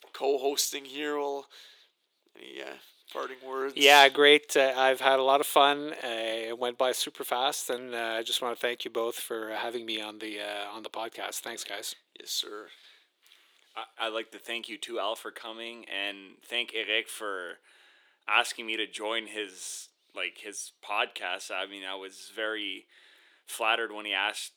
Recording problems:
thin; somewhat; fading below 350 Hz

